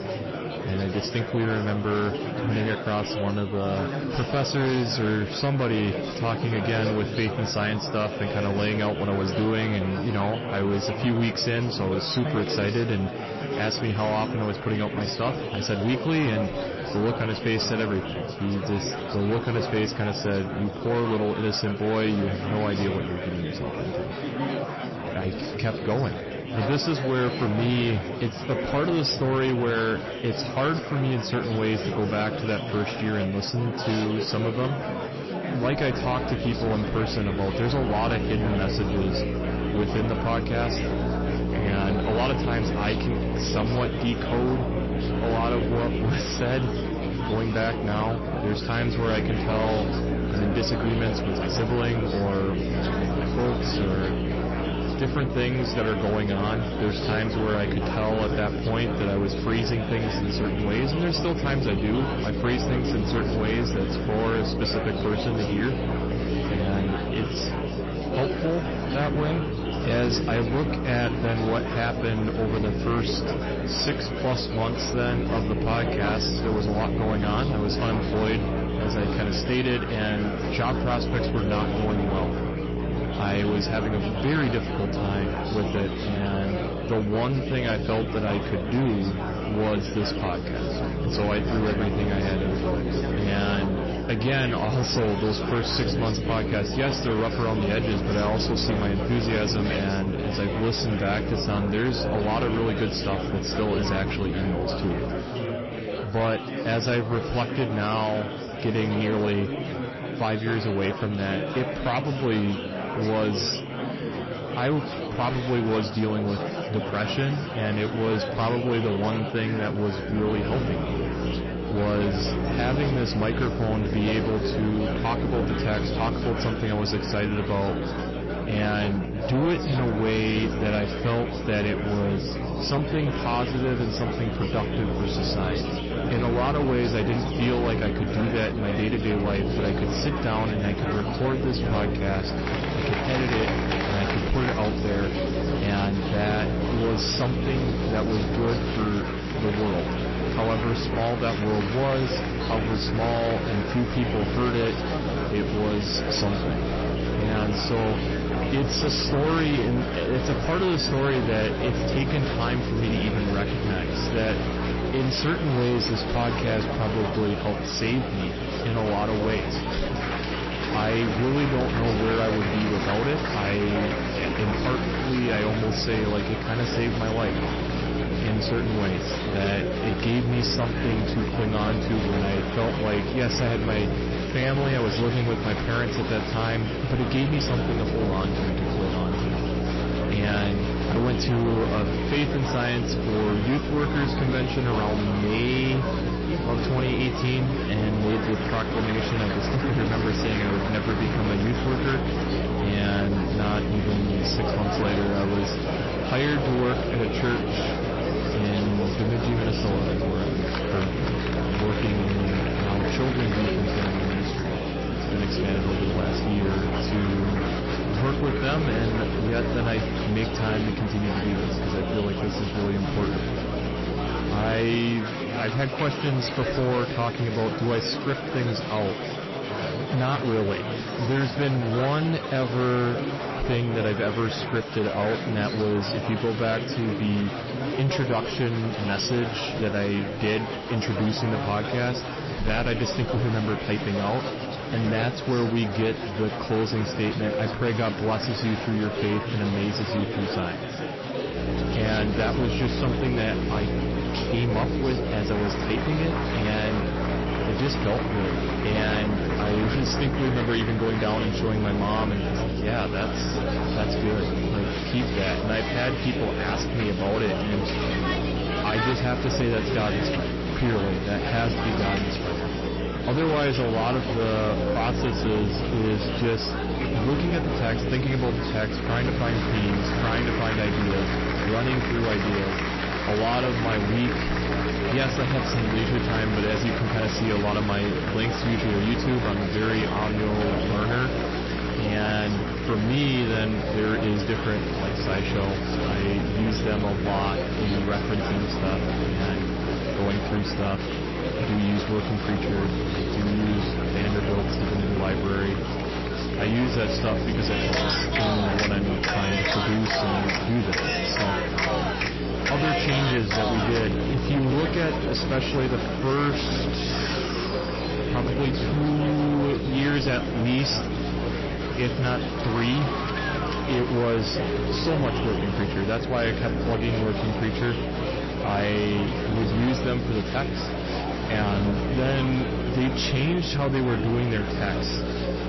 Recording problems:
distortion; slight; 15% of the sound clipped
garbled, watery; slightly; nothing above 5.5 kHz
electrical hum; loud; from 36 s to 1:45, from 2:00 to 3:45 and from 4:11 on; 60 Hz, 7 dB below the speech
murmuring crowd; loud; throughout; 4 dB below the speech

